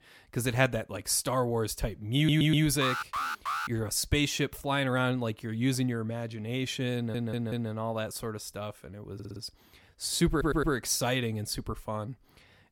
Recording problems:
audio stuttering; 4 times, first at 2 s
alarm; noticeable; at 3 s; peak 2 dB below the speech

